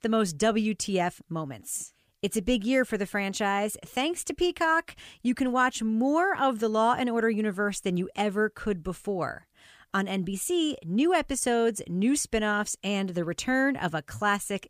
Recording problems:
none

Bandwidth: 15 kHz